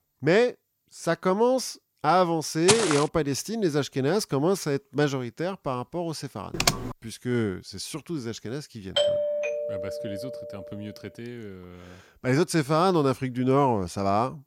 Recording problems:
footsteps; loud; at 2.5 s; peak 3 dB above the speech
keyboard typing; loud; at 6.5 s; peak 1 dB above the speech
doorbell; loud; from 9 to 11 s; peak 2 dB above the speech

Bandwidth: 16.5 kHz